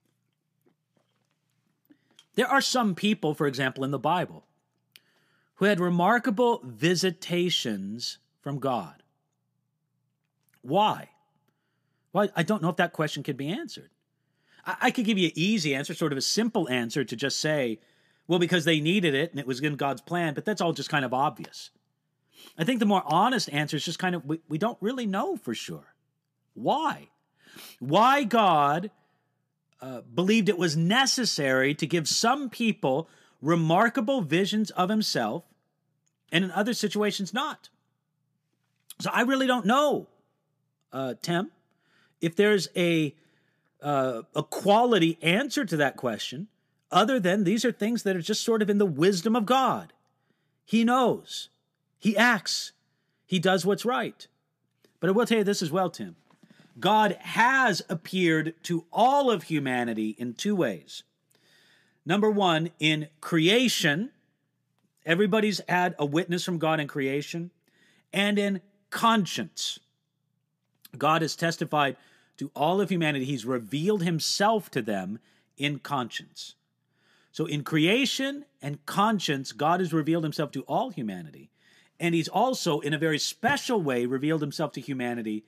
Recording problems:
none

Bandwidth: 14.5 kHz